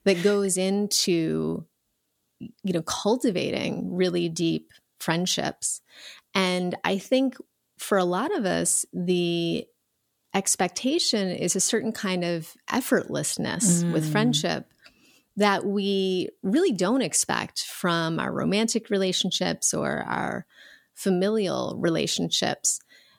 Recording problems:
none

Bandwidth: 18.5 kHz